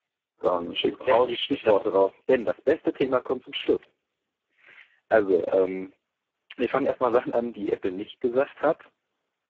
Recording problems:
phone-call audio; poor line
garbled, watery; badly

